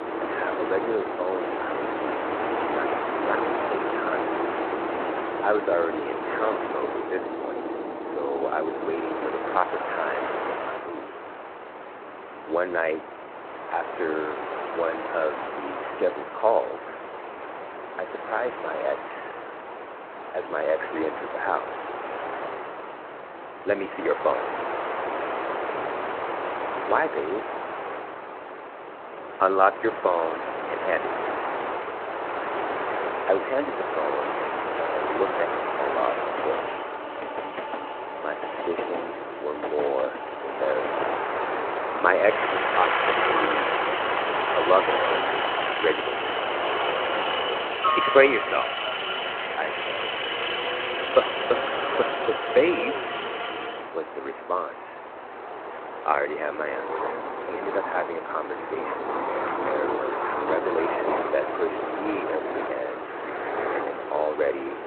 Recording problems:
phone-call audio; nothing above 3.5 kHz
train or aircraft noise; loud; throughout; 1 dB below the speech

